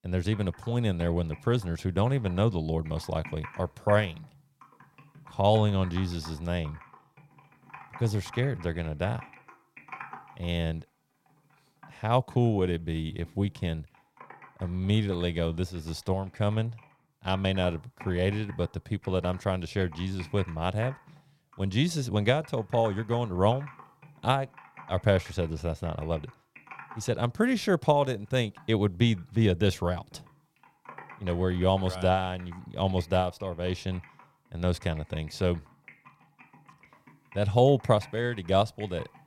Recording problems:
household noises; faint; throughout; 20 dB below the speech

